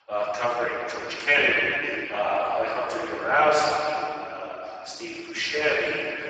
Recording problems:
room echo; strong; dies away in 3 s
off-mic speech; far
garbled, watery; badly; nothing above 7.5 kHz
thin; very; fading below 350 Hz

